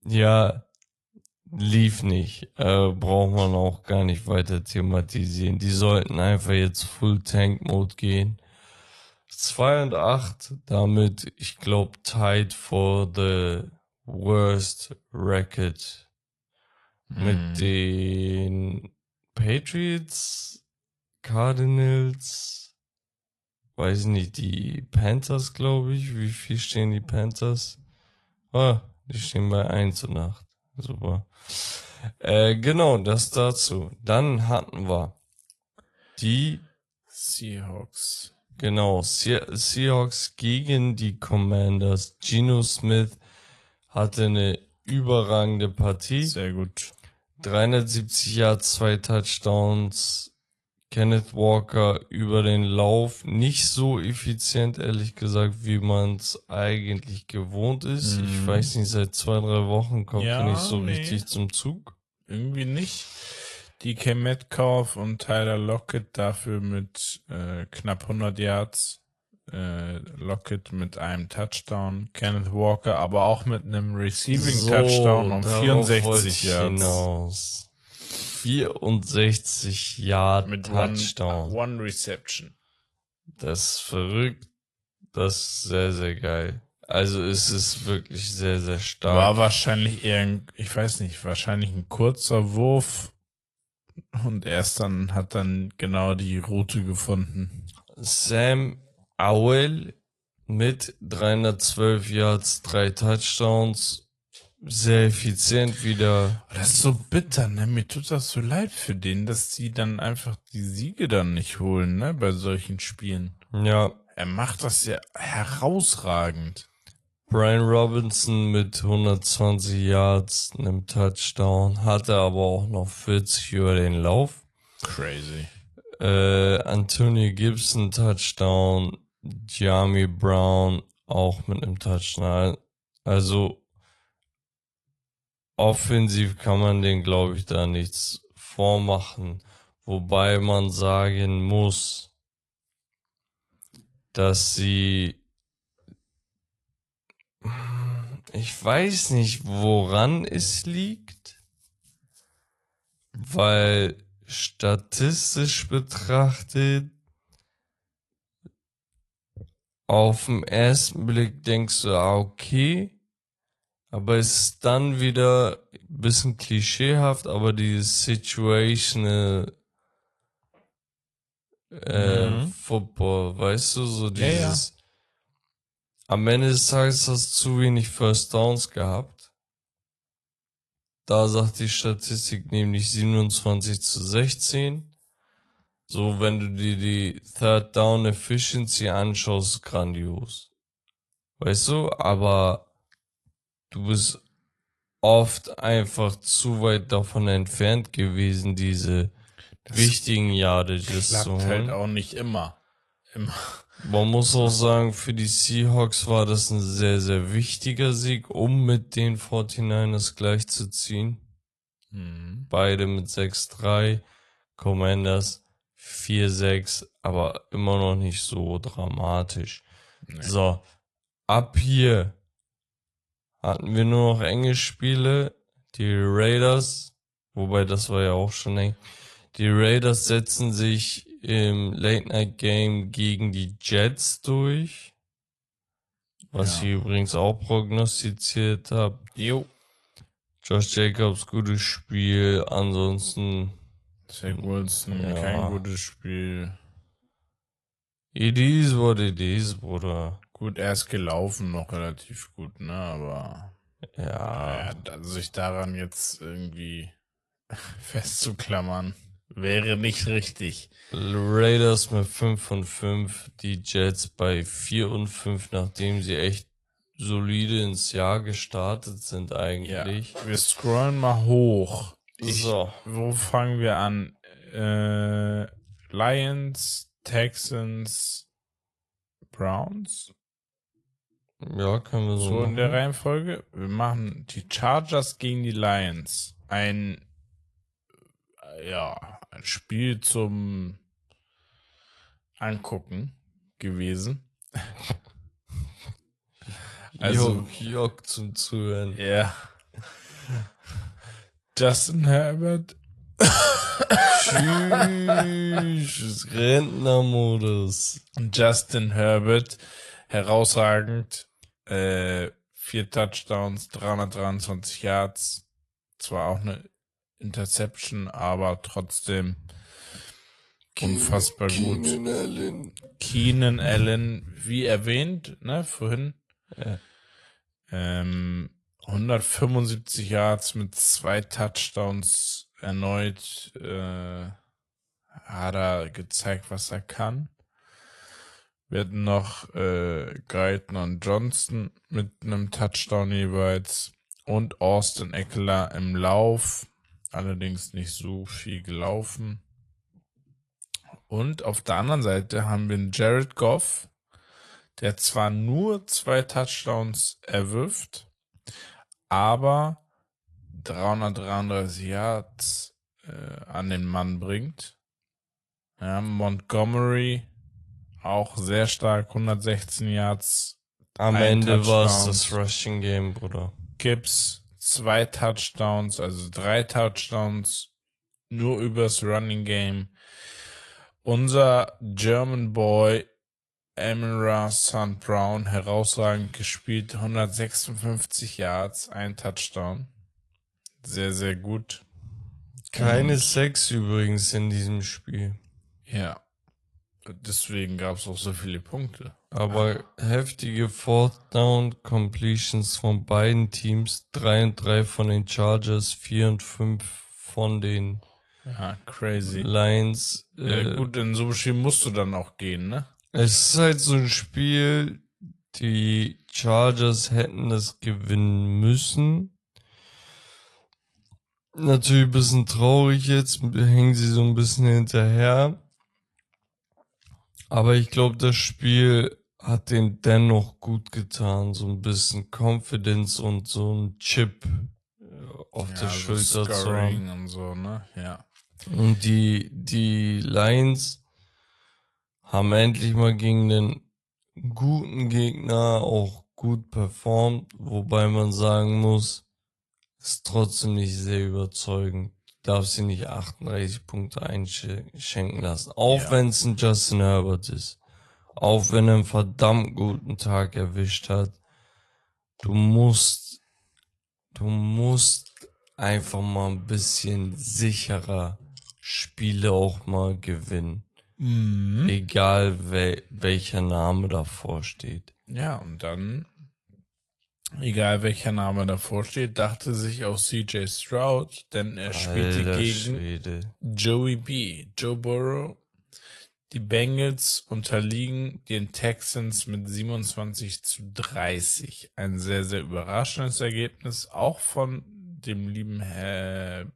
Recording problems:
wrong speed, natural pitch; too slow; 0.7 times normal speed
garbled, watery; slightly; nothing above 11 kHz

